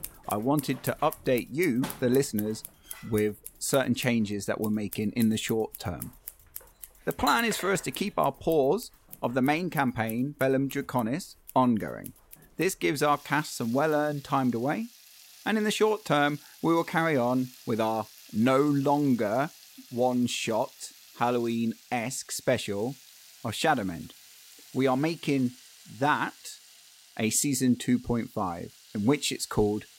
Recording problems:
household noises; noticeable; throughout; 20 dB below the speech

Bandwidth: 16 kHz